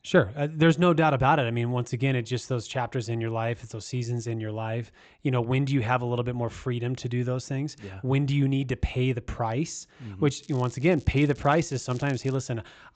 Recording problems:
high frequencies cut off; noticeable; nothing above 8 kHz
crackling; faint; from 10 to 12 s; 25 dB below the speech

